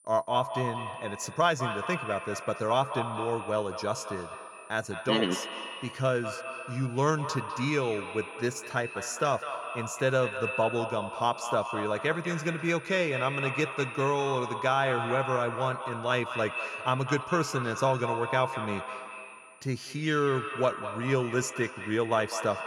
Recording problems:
echo of what is said; strong; throughout; 200 ms later, 7 dB below the speech
high-pitched whine; faint; throughout; 9 kHz, 25 dB below the speech

